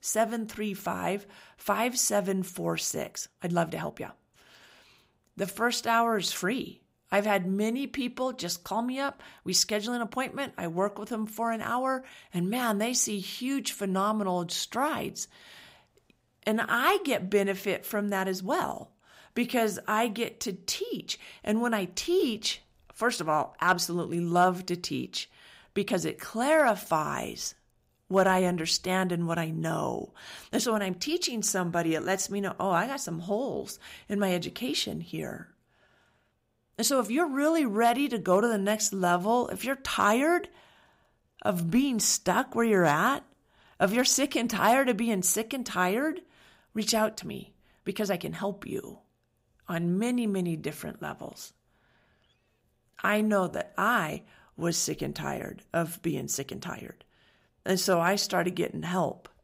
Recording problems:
uneven, jittery; strongly; from 3 to 58 s

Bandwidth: 15.5 kHz